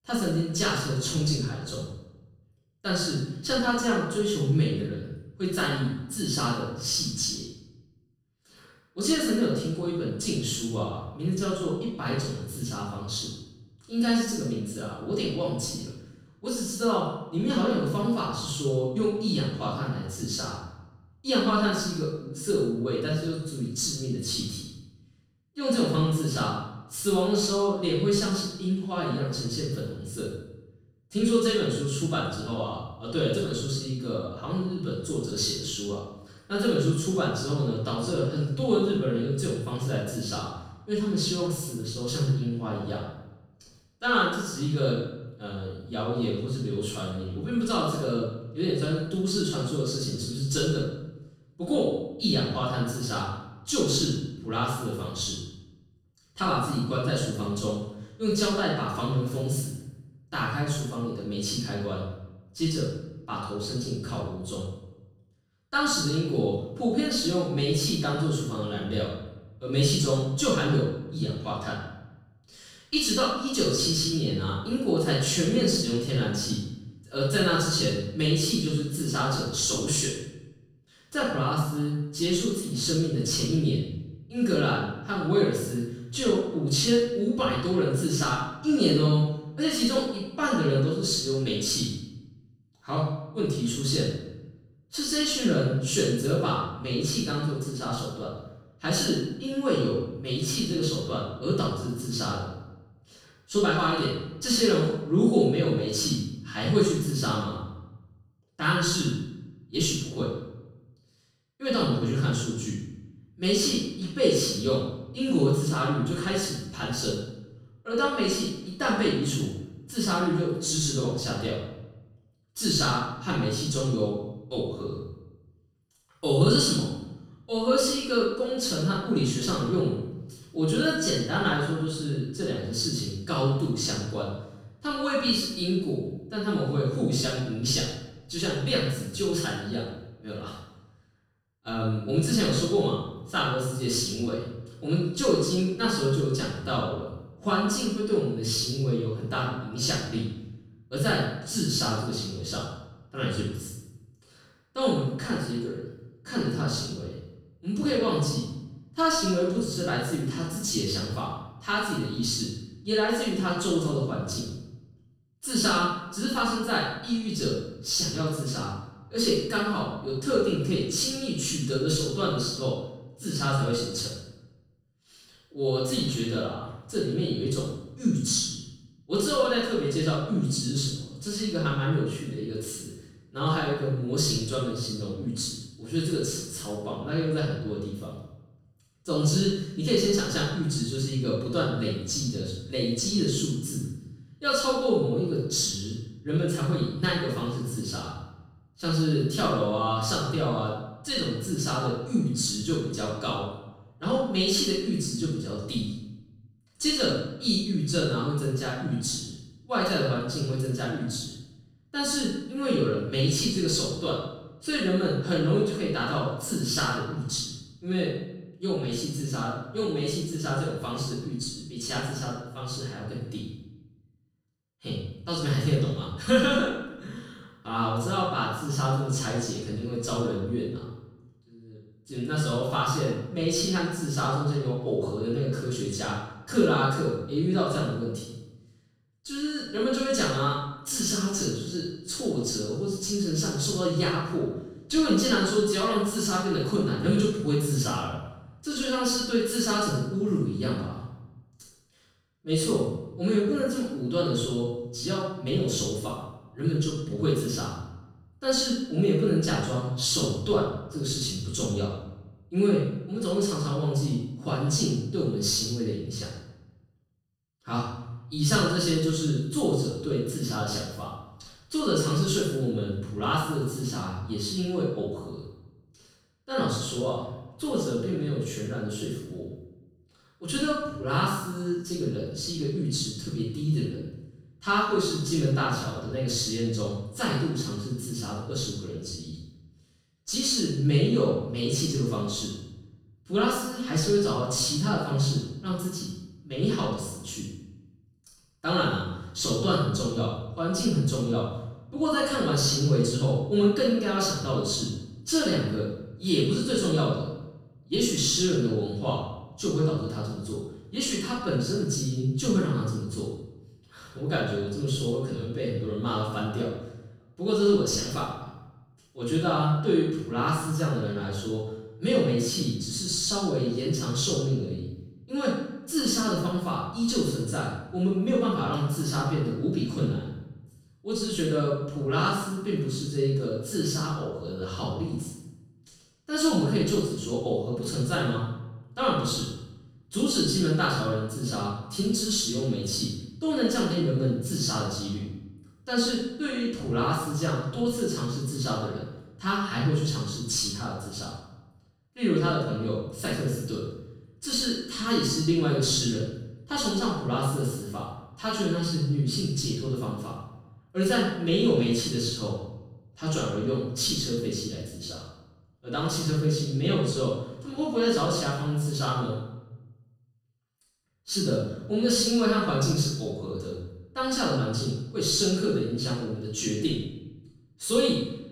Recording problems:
room echo; strong; dies away in 0.8 s
off-mic speech; far

